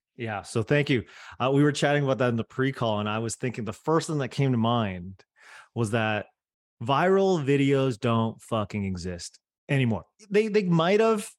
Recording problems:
none

